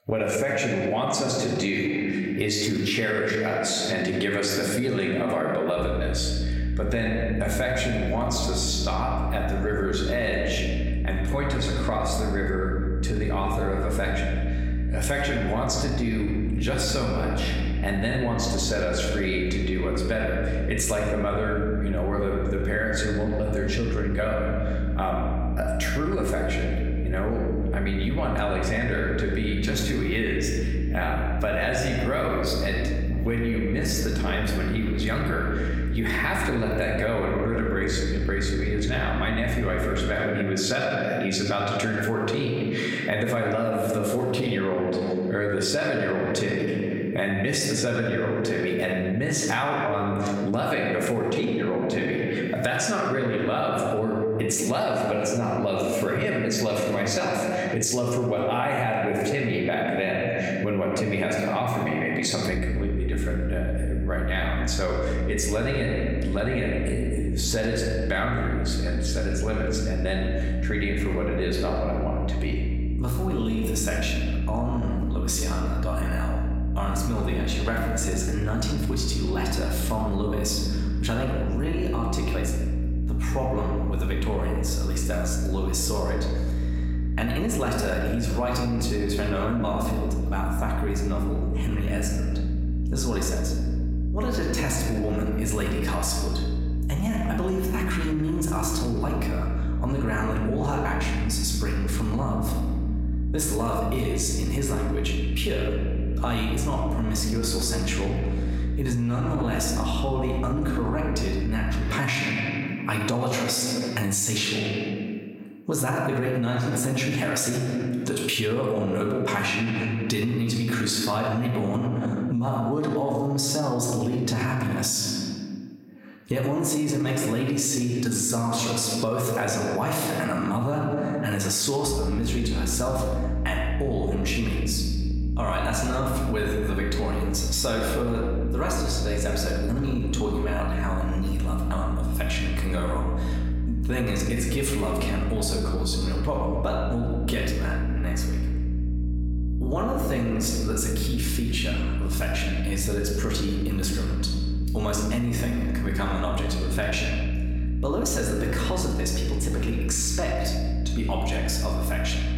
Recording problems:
room echo; noticeable; dies away in 1.4 s
off-mic speech; somewhat distant
squashed, flat; somewhat
electrical hum; noticeable; from 6 to 40 s, from 1:03 to 1:52 and from 2:12 on; 60 Hz, 15 dB below the speech

